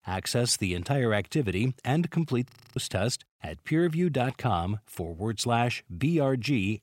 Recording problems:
audio freezing; at 2.5 s

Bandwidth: 16 kHz